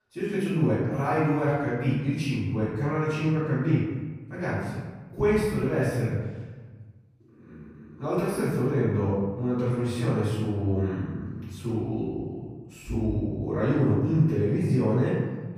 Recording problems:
room echo; strong; dies away in 1.3 s
off-mic speech; far

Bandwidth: 14.5 kHz